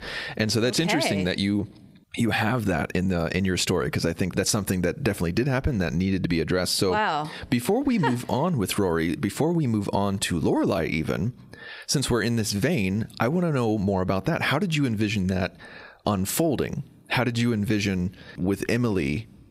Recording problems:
squashed, flat; somewhat

